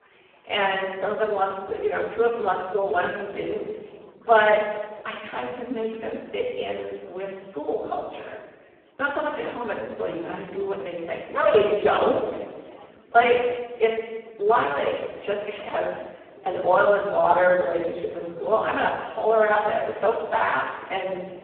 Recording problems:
phone-call audio; poor line
off-mic speech; far
room echo; noticeable; dies away in 1.1 s
background chatter; faint; throughout; 4 voices, 25 dB below the speech

